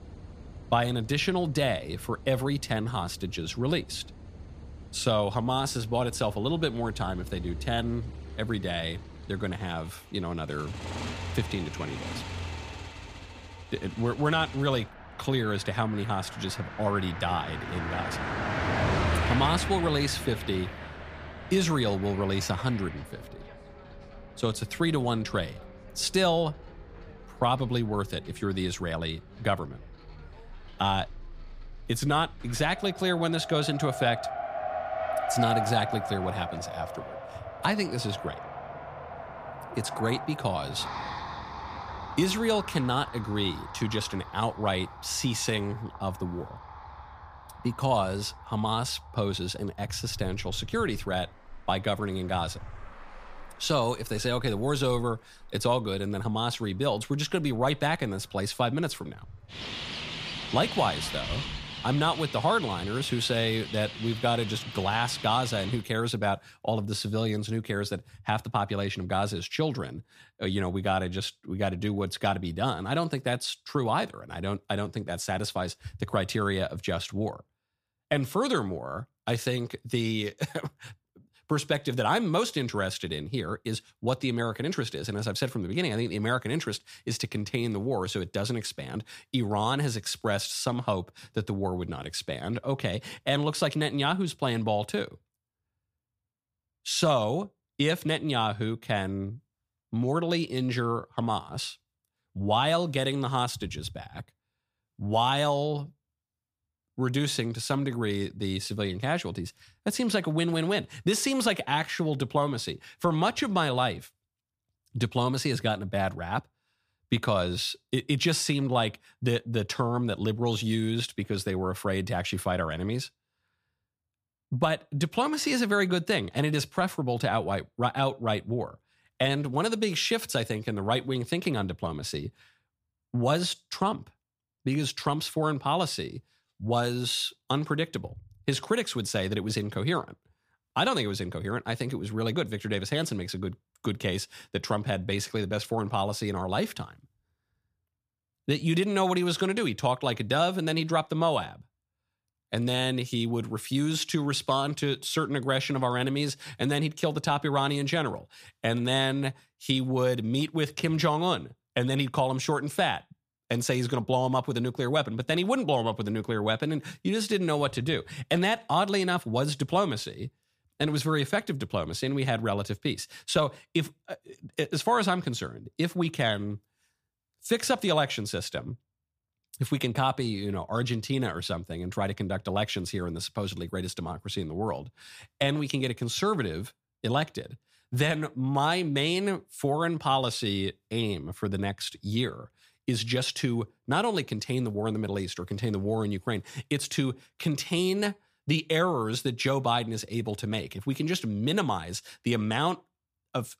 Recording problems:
traffic noise; loud; until 1:06; 9 dB below the speech

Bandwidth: 15 kHz